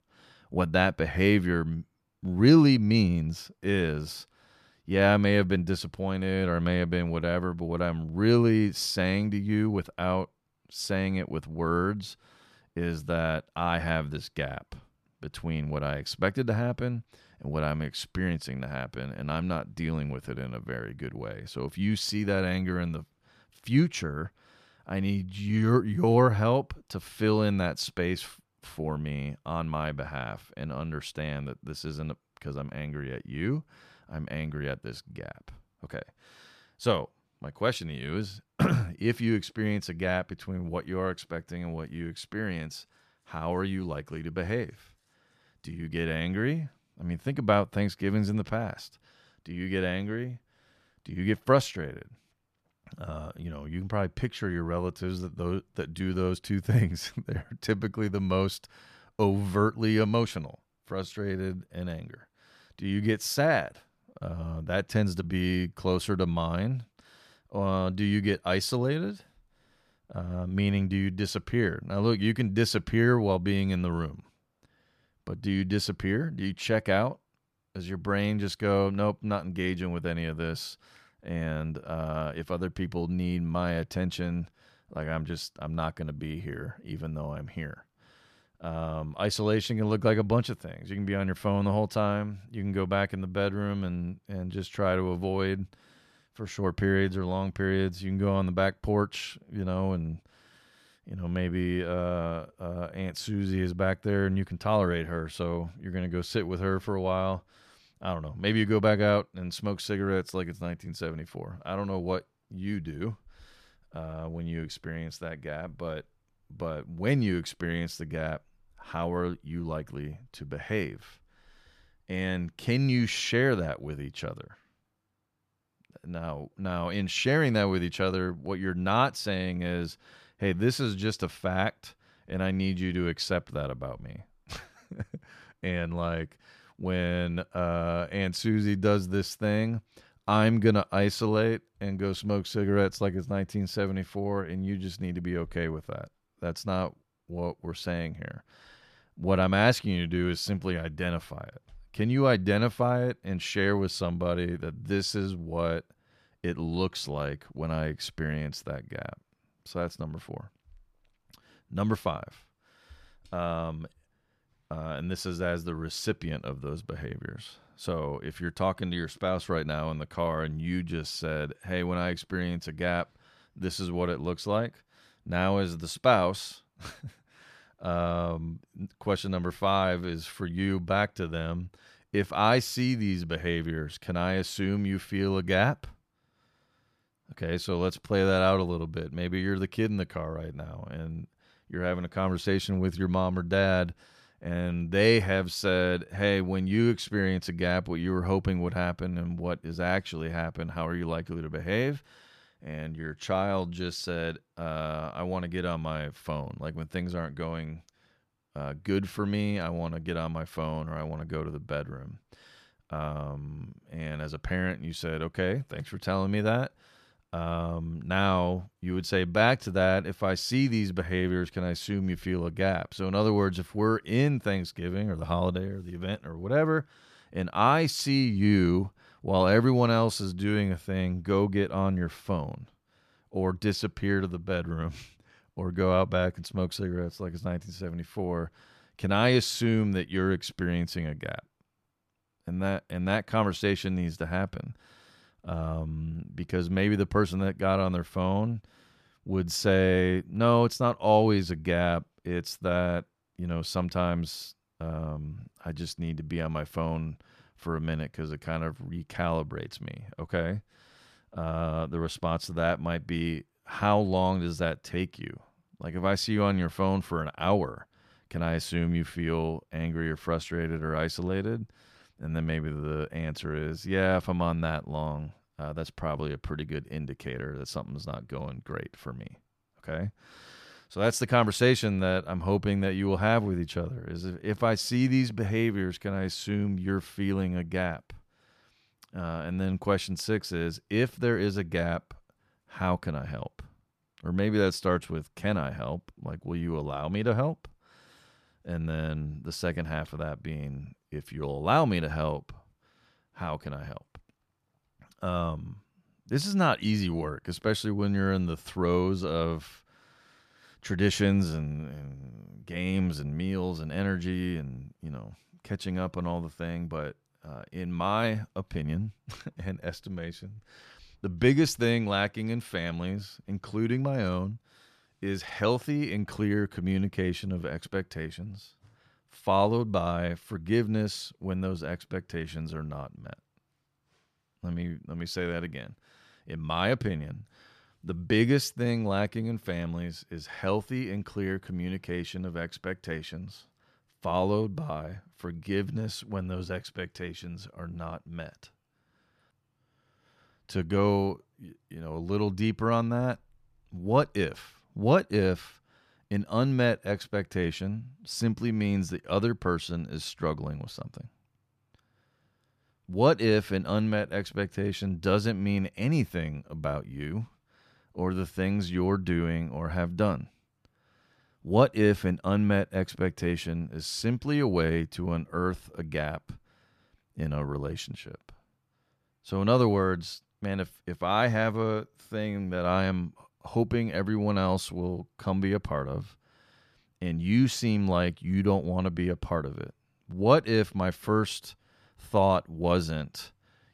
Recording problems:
none

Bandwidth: 14.5 kHz